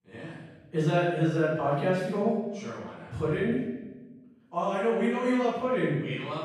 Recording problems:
room echo; strong; dies away in 1 s
off-mic speech; far

